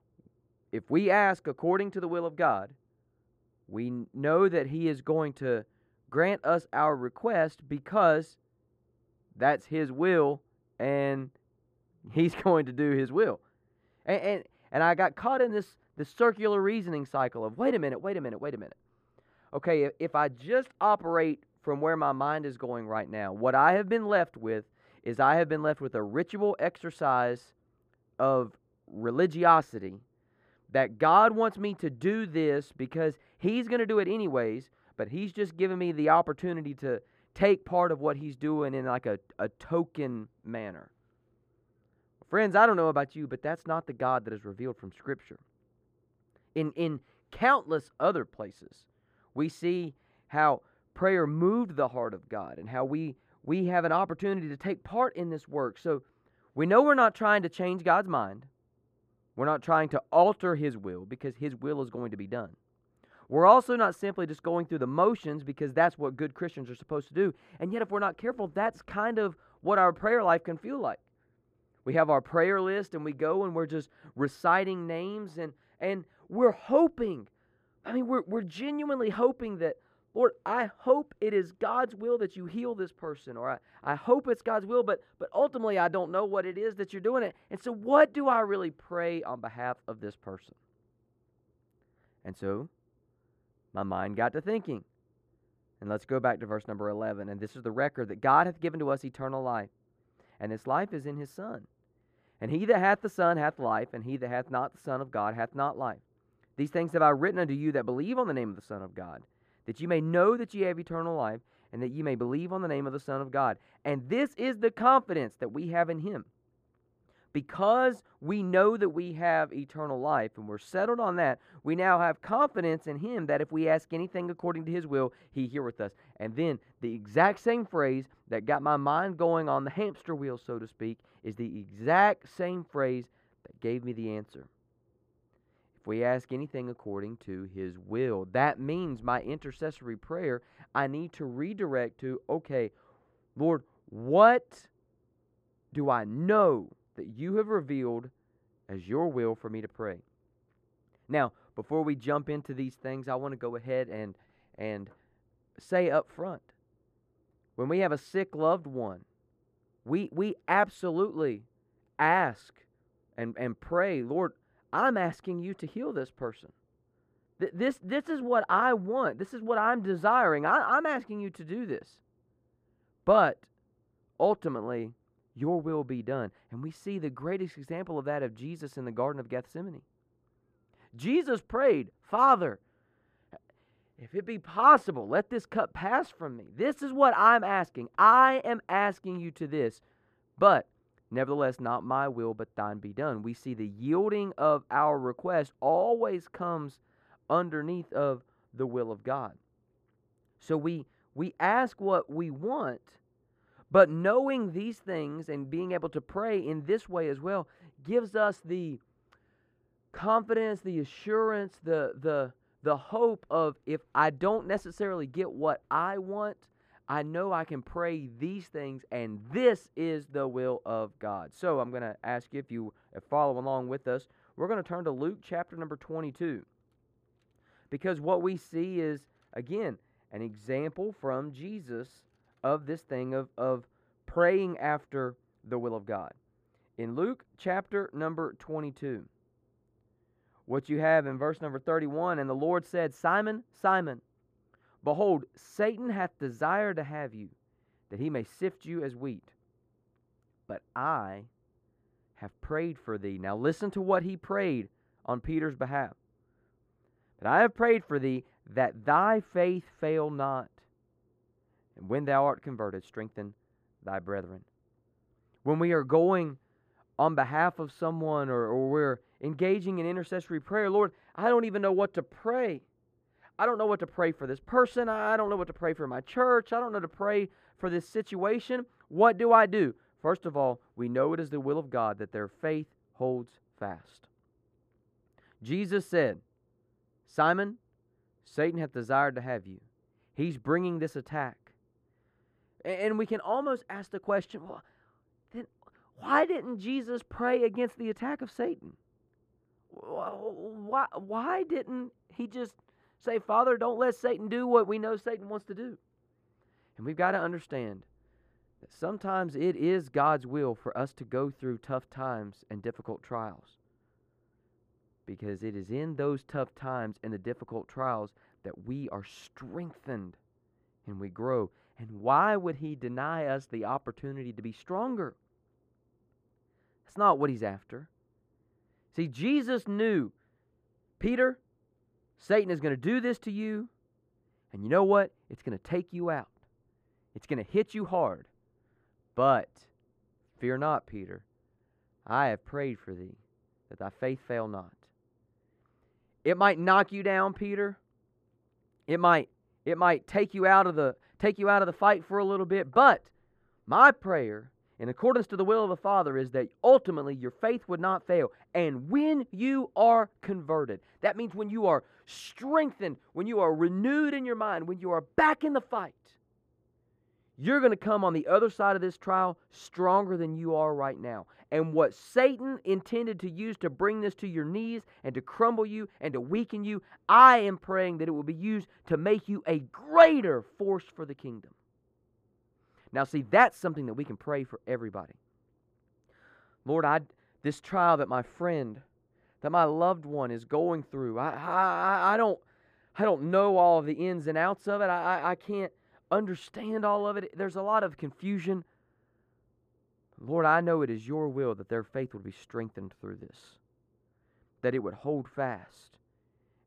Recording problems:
muffled; very; fading above 2.5 kHz

